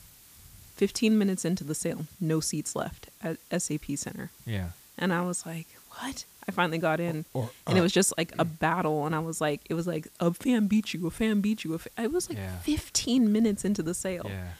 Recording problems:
hiss; faint; throughout; 25 dB below the speech

